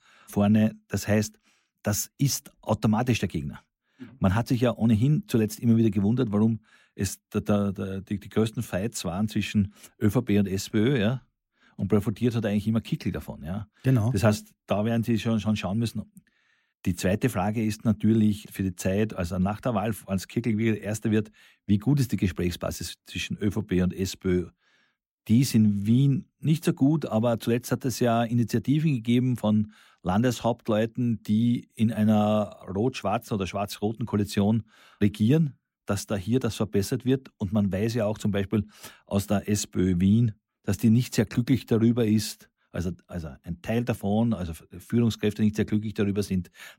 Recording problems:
none

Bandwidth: 16 kHz